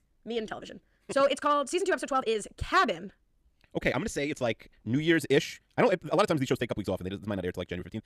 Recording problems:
wrong speed, natural pitch; too fast; 1.7 times normal speed

